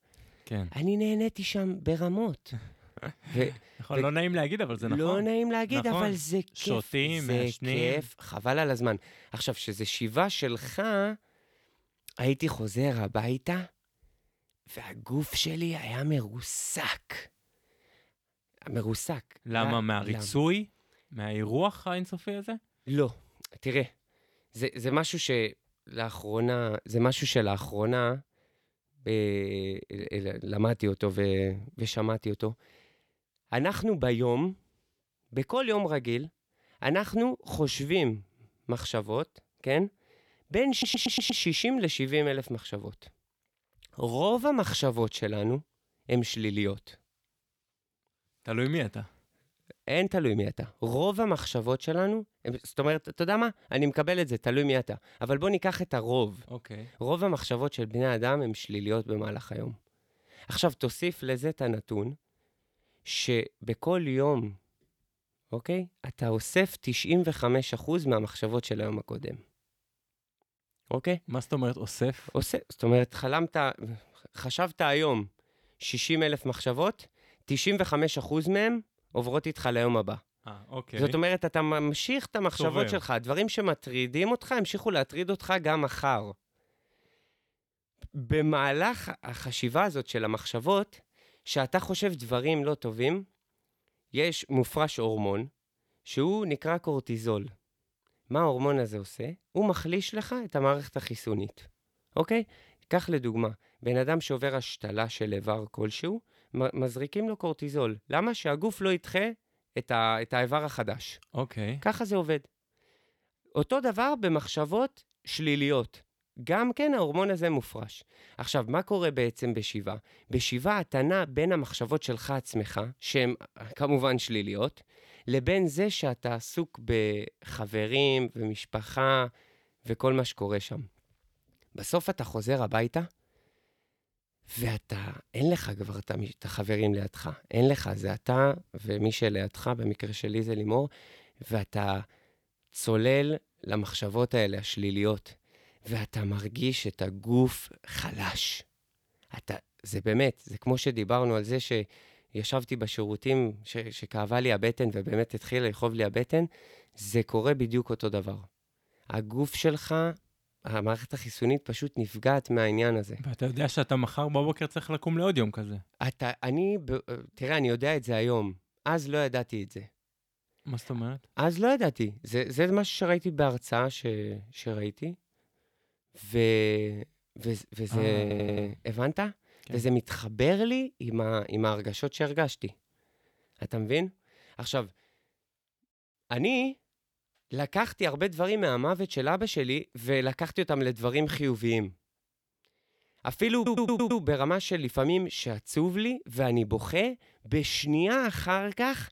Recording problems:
audio stuttering; at 41 s, at 2:58 and at 3:14

